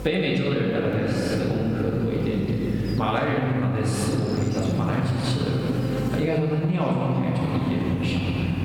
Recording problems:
room echo; strong; dies away in 3 s
off-mic speech; far
squashed, flat; somewhat
electrical hum; noticeable; throughout; 50 Hz, 15 dB below the speech

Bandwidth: 17 kHz